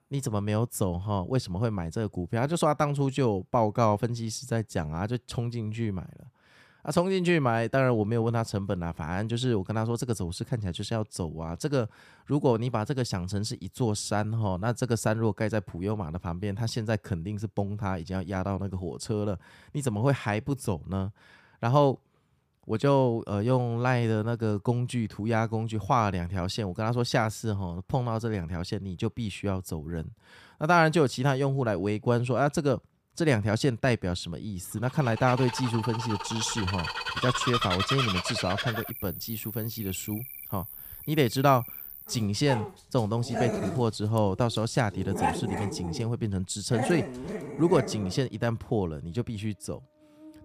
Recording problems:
animal sounds; loud; from 35 s on; 5 dB below the speech

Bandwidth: 15 kHz